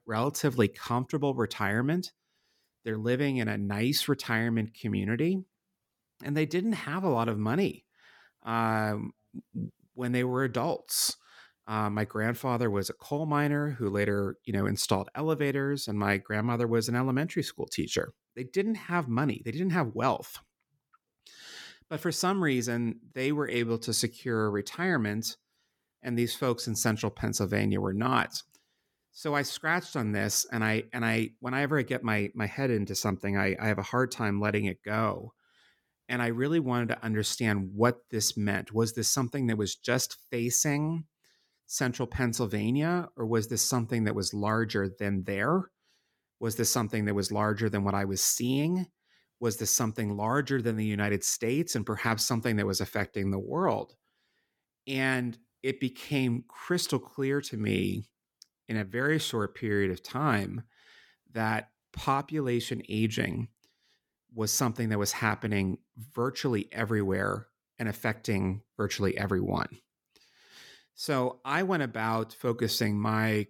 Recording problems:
none

